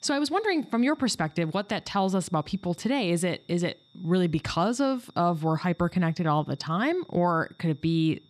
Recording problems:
high-pitched whine; faint; throughout; 3.5 kHz, 35 dB below the speech

